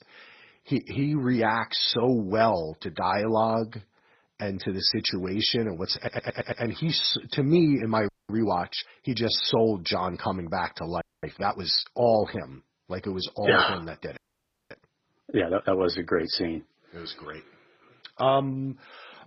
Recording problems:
garbled, watery; badly; nothing above 5.5 kHz
audio stuttering; at 6 s
audio freezing; at 8 s, at 11 s and at 14 s for 0.5 s

